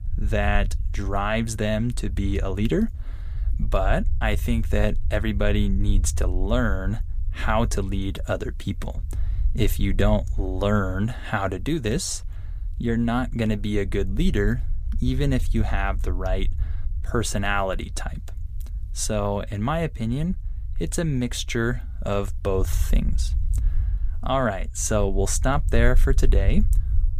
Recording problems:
low rumble; faint; throughout; 20 dB below the speech

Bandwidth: 15 kHz